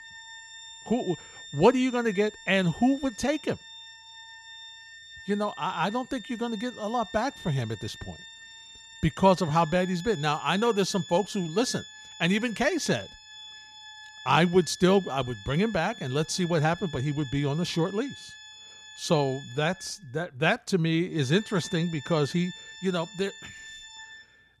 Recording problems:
background music; noticeable; throughout; 15 dB below the speech

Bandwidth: 13.5 kHz